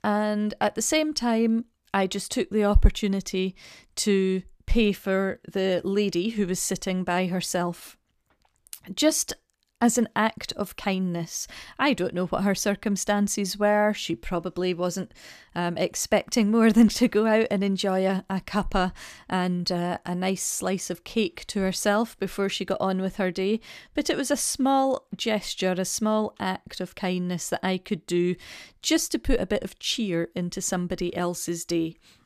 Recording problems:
none

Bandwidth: 14.5 kHz